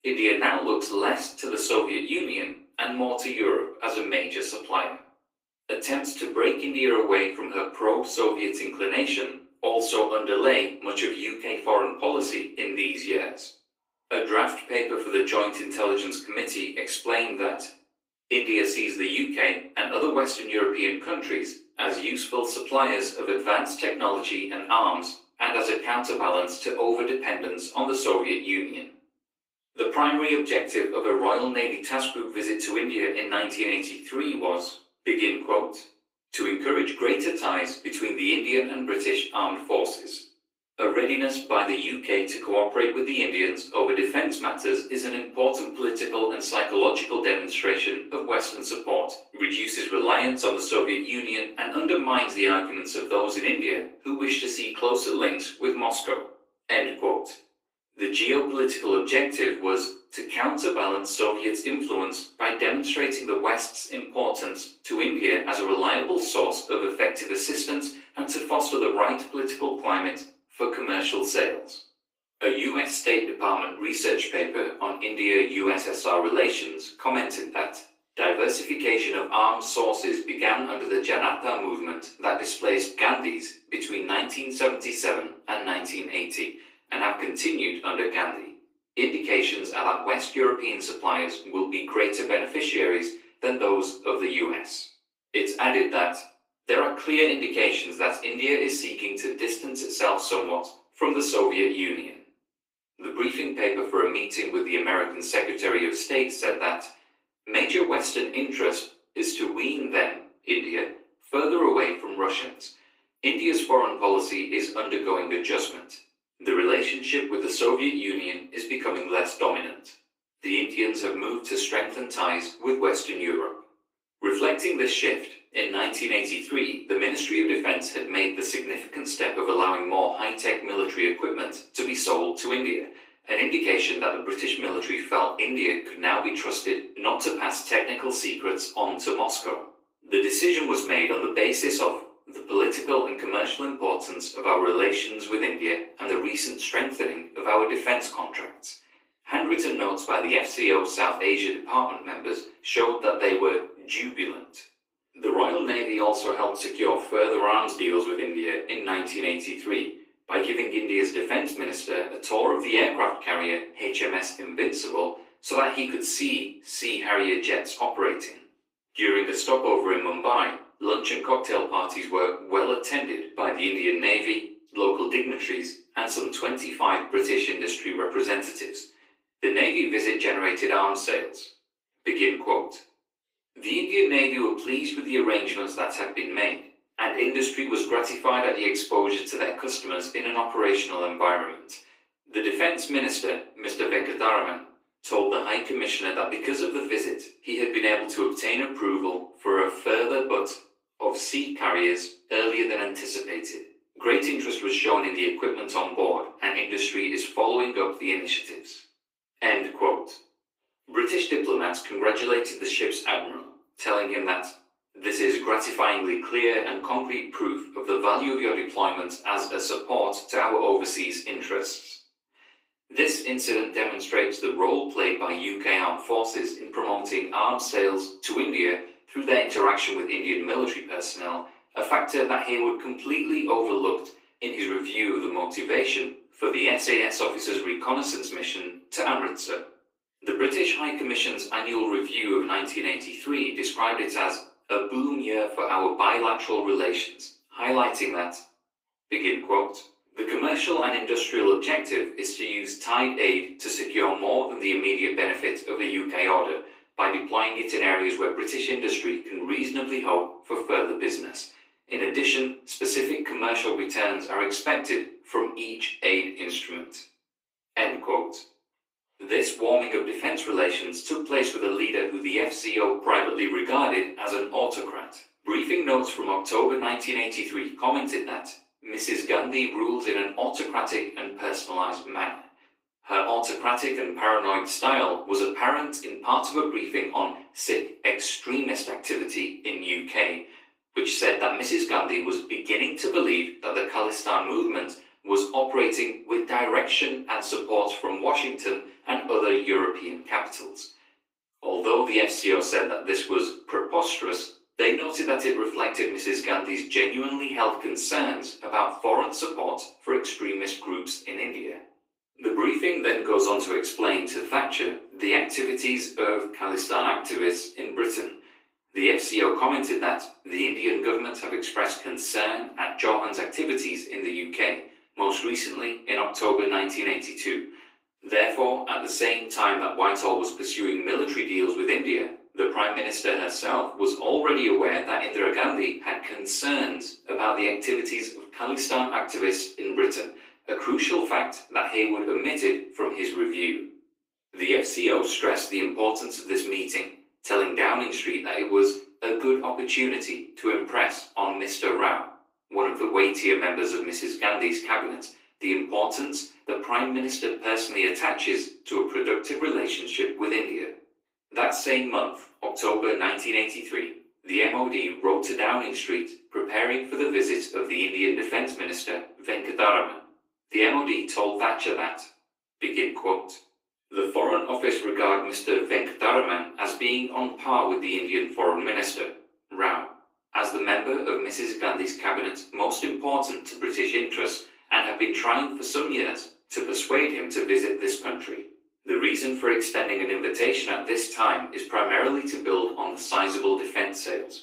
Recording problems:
off-mic speech; far
thin; somewhat; fading below 300 Hz
room echo; slight; dies away in 0.4 s
garbled, watery; slightly; nothing above 15.5 kHz

